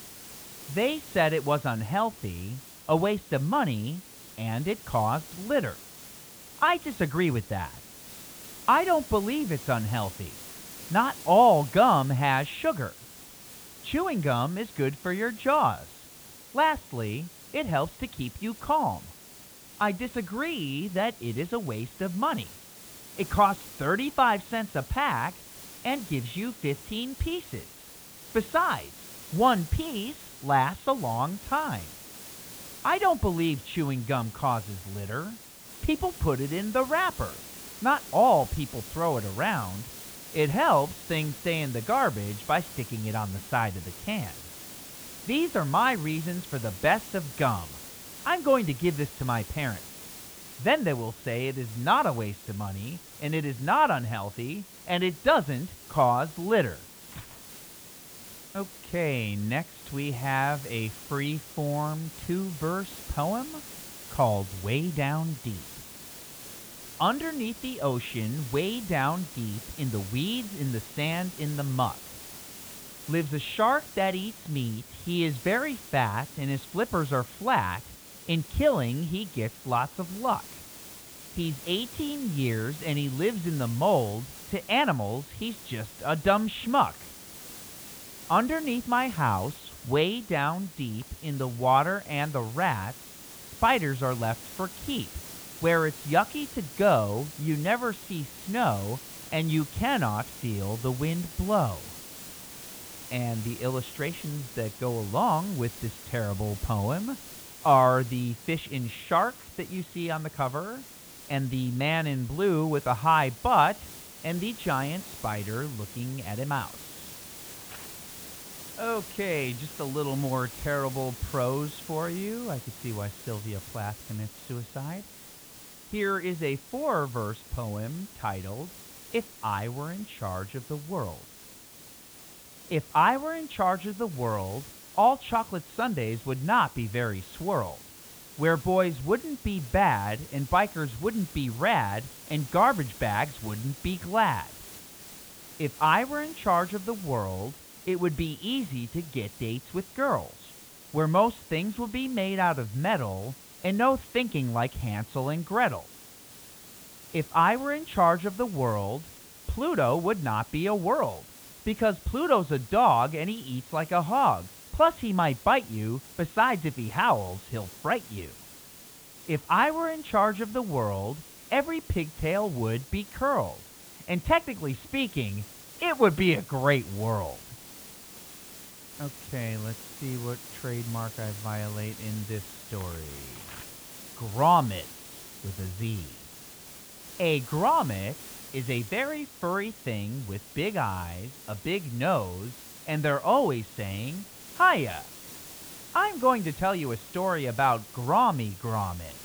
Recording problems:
high frequencies cut off; severe; nothing above 4 kHz
hiss; noticeable; throughout; 15 dB below the speech

